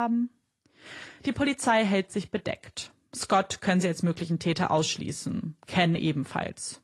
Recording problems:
garbled, watery; slightly
abrupt cut into speech; at the start

